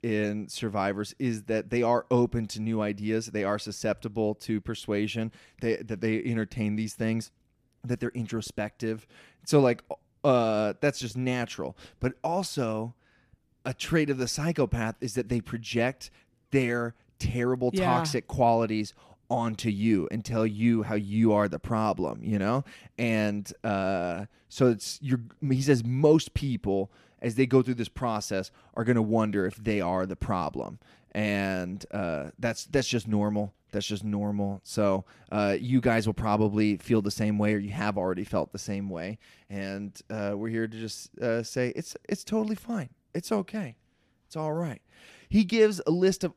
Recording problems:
none

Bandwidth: 14.5 kHz